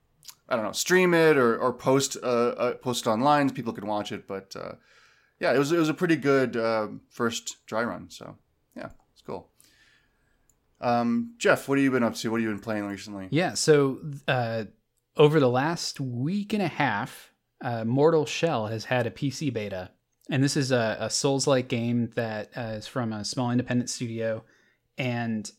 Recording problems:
none

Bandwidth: 16 kHz